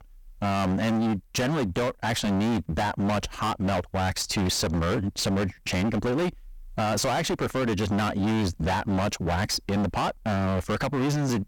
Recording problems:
distortion; heavy; 35% of the sound clipped

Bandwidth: 18 kHz